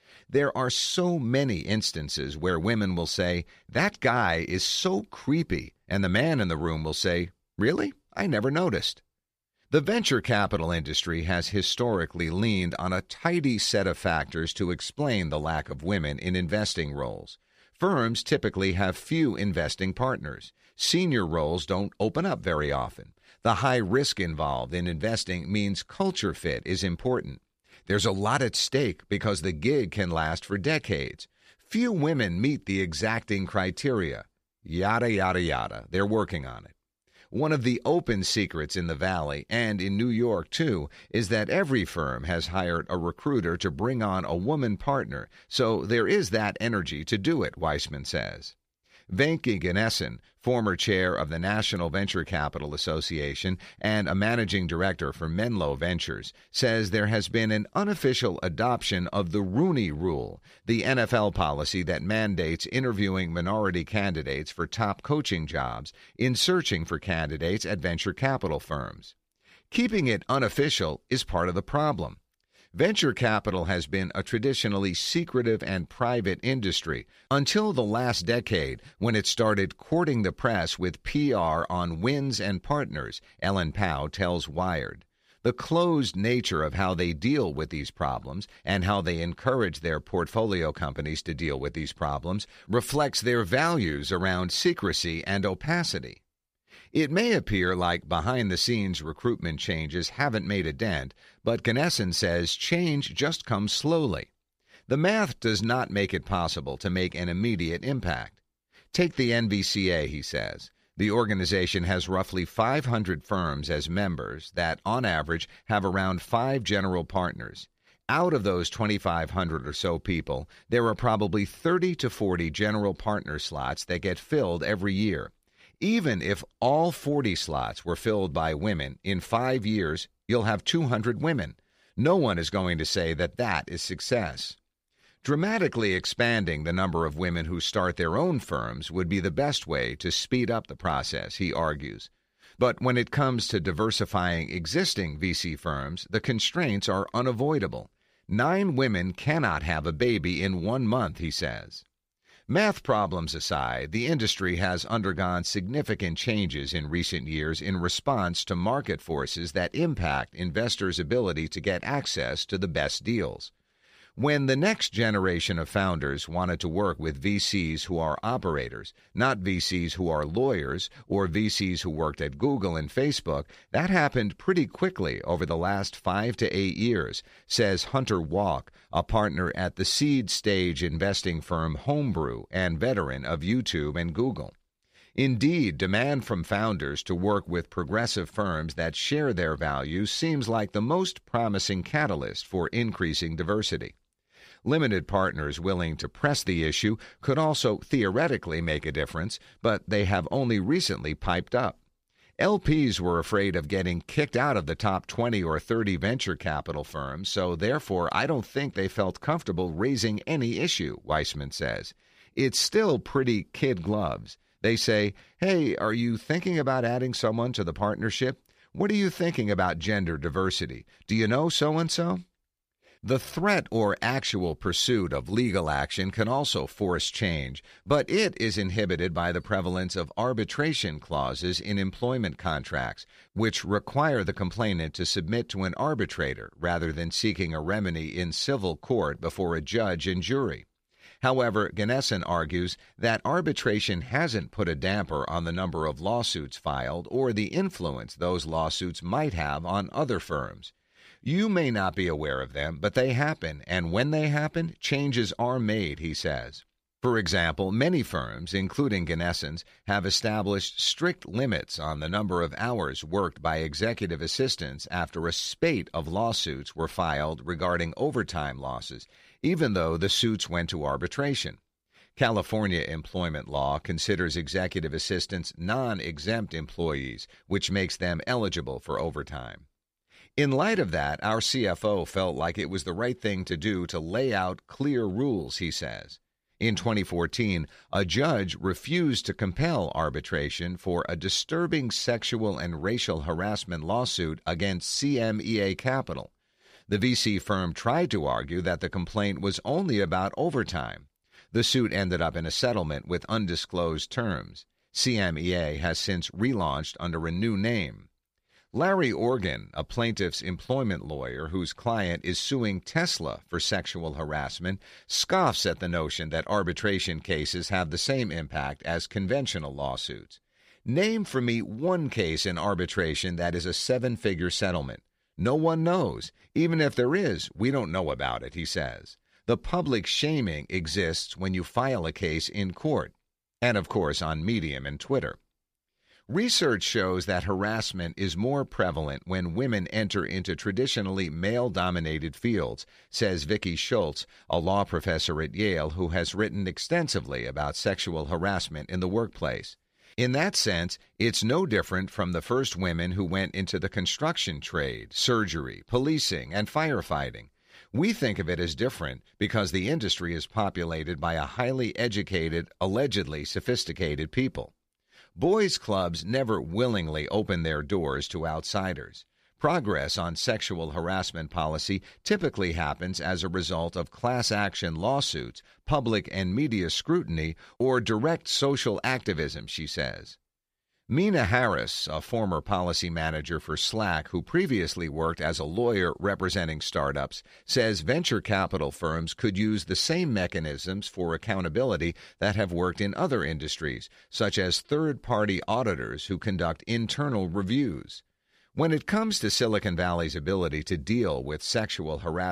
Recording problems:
abrupt cut into speech; at the end

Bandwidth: 15 kHz